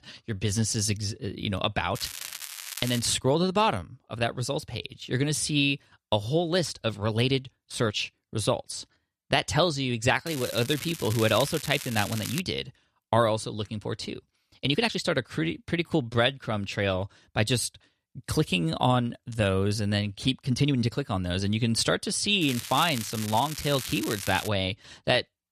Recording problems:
crackling; loud; from 2 to 3 s, from 10 to 12 s and from 22 to 24 s; 9 dB below the speech
uneven, jittery; strongly; from 3 to 21 s

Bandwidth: 14 kHz